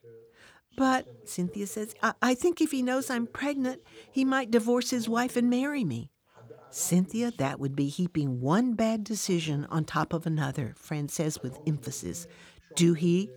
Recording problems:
voice in the background; faint; throughout; 25 dB below the speech

